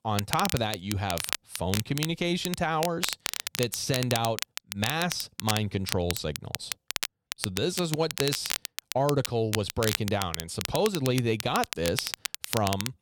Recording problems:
crackle, like an old record; loud; 4 dB below the speech

